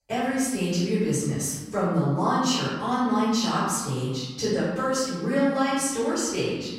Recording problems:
room echo; strong; dies away in 1.2 s
off-mic speech; far

